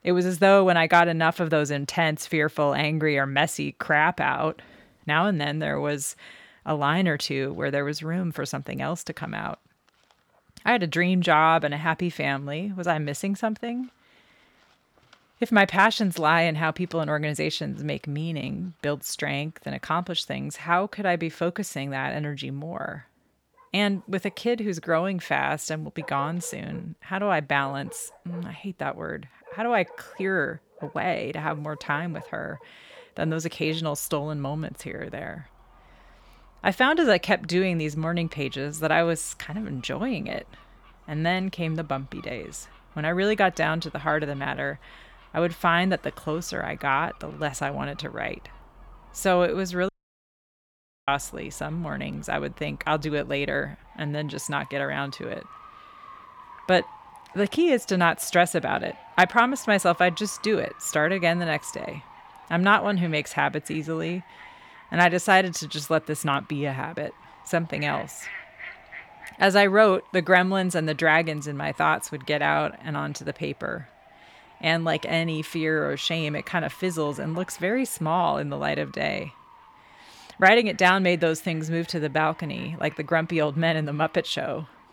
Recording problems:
animal sounds; faint; throughout; 25 dB below the speech
audio cutting out; at 50 s for 1 s

